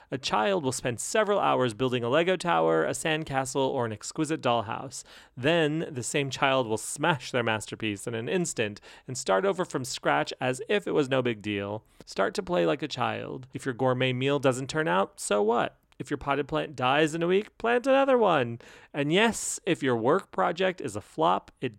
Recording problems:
none

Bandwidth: 16 kHz